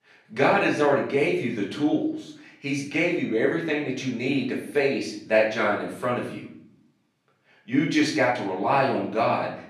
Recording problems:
off-mic speech; far
room echo; noticeable; dies away in 0.5 s

